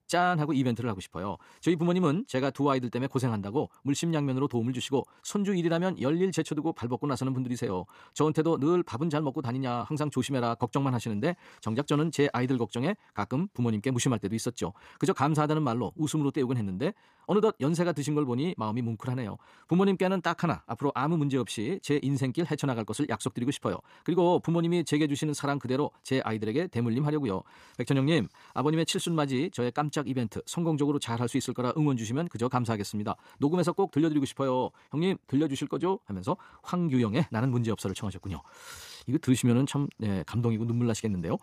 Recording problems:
wrong speed, natural pitch; too fast; 1.6 times normal speed

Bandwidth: 14.5 kHz